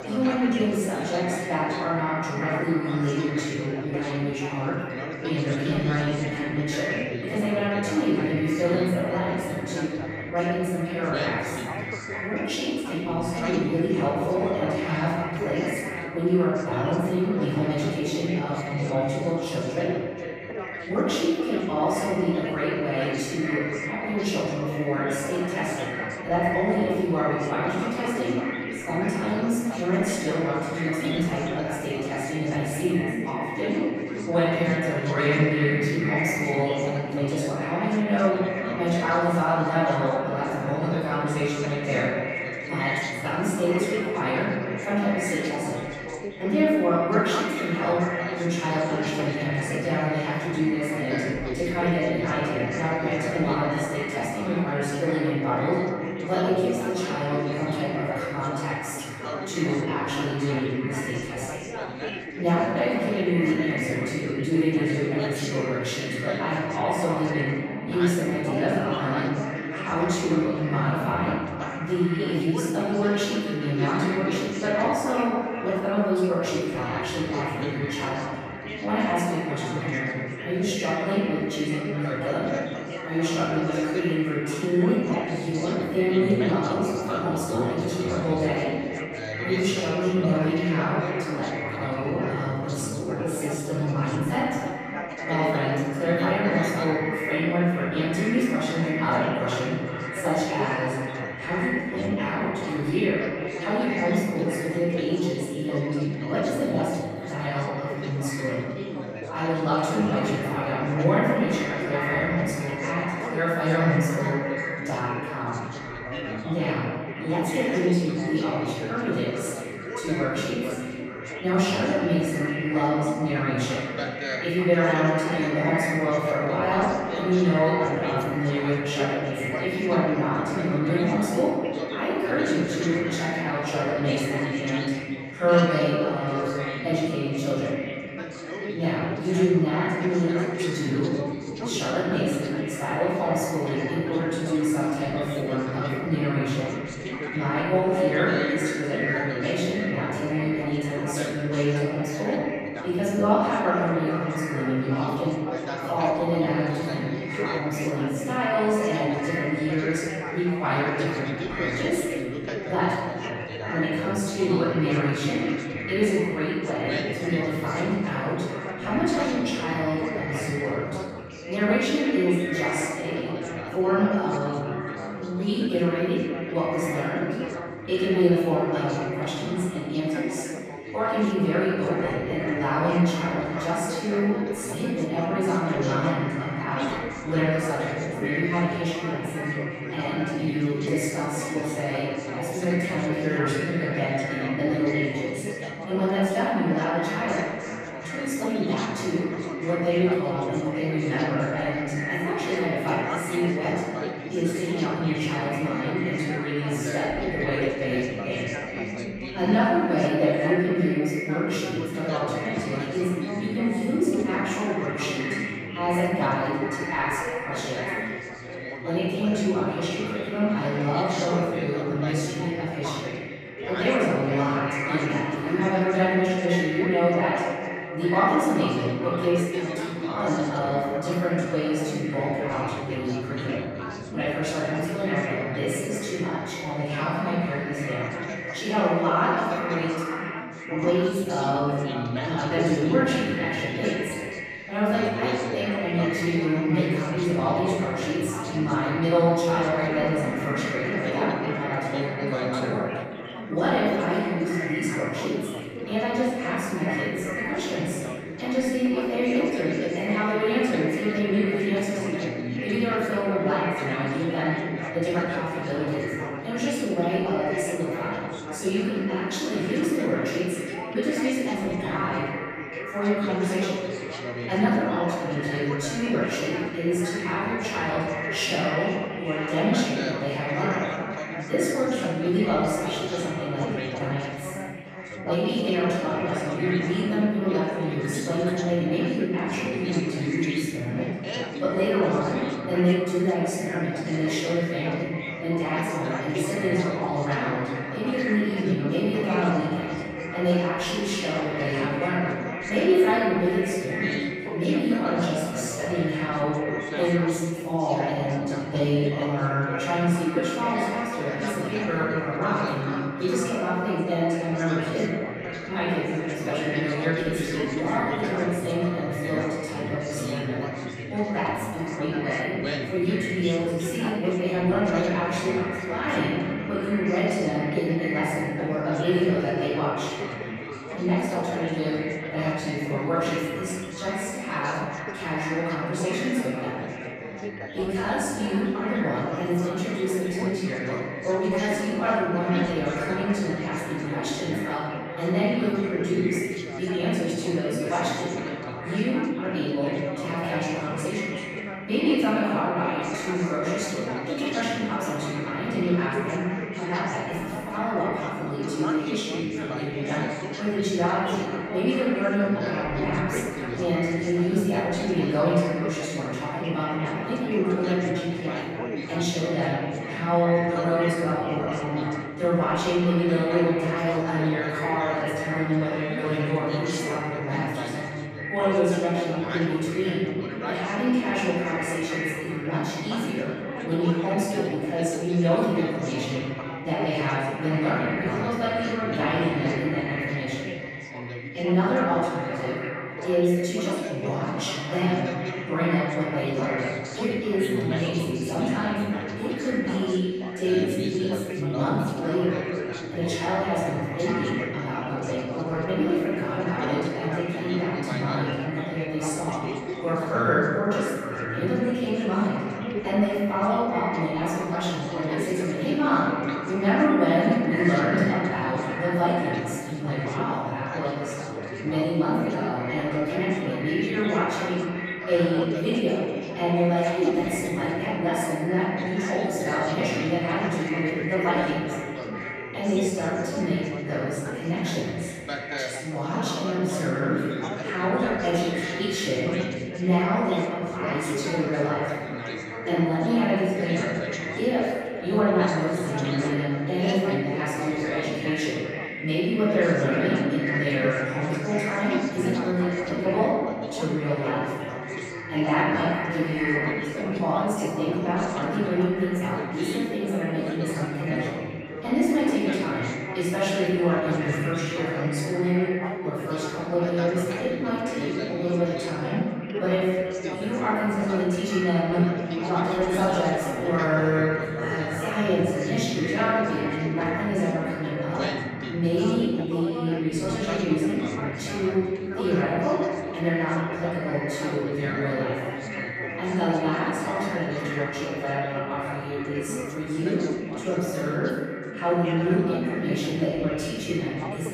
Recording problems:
echo of what is said; strong; throughout; 420 ms later, 10 dB below the speech
room echo; strong; dies away in 1.5 s
off-mic speech; far
background chatter; loud; throughout; 4 voices, 9 dB below the speech

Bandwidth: 15.5 kHz